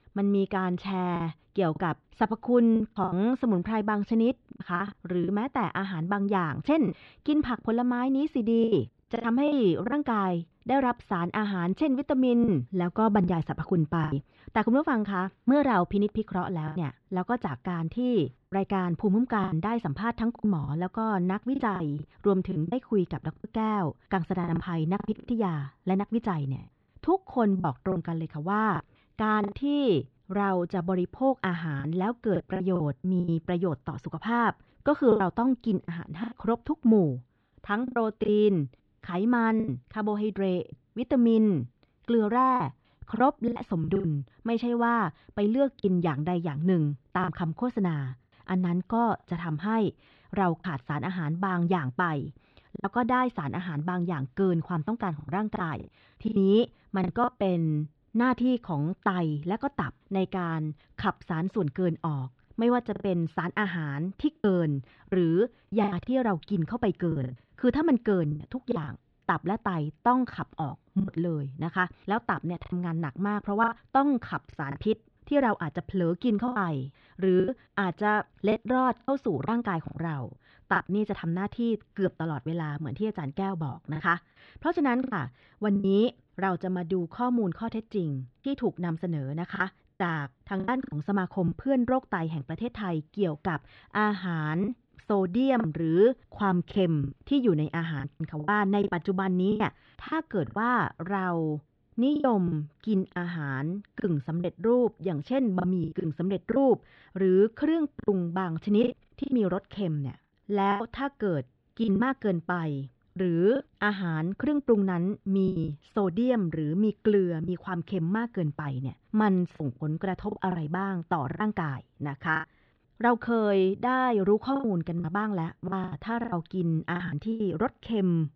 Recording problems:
muffled; very; fading above 4 kHz
choppy; very; 7% of the speech affected

